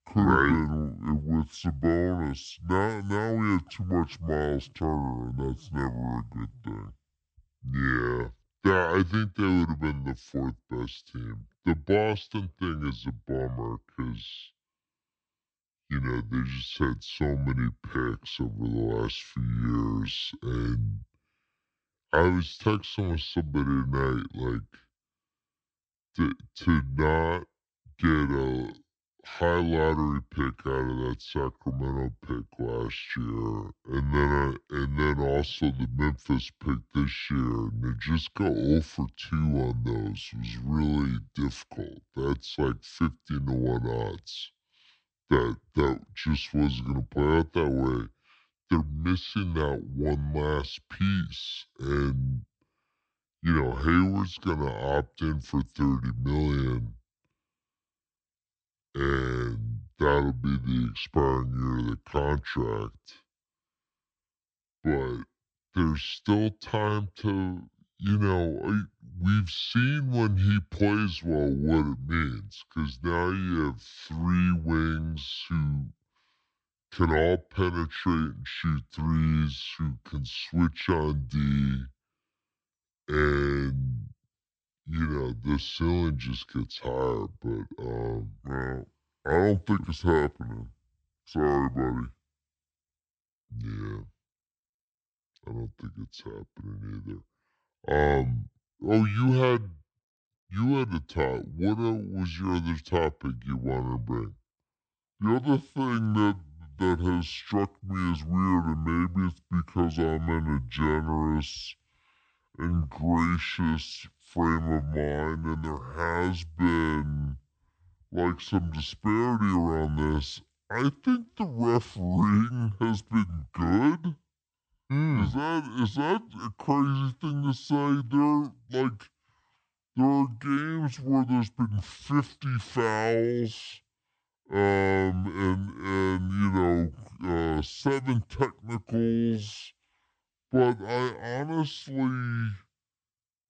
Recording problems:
wrong speed and pitch; too slow and too low; 0.6 times normal speed

